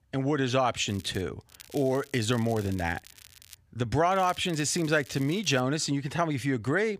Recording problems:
crackling; faint; at 1 s, from 1.5 to 3.5 s and from 4 to 5.5 s; 20 dB below the speech

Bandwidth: 15 kHz